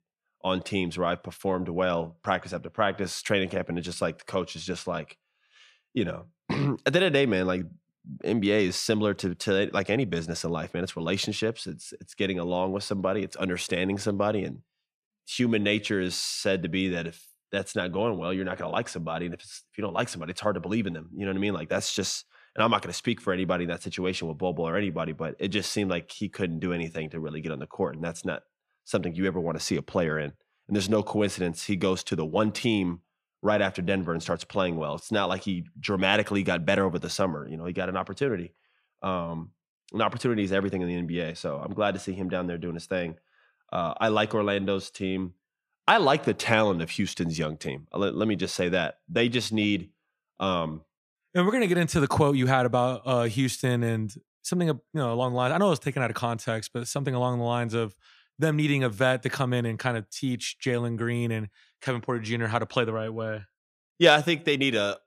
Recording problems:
none

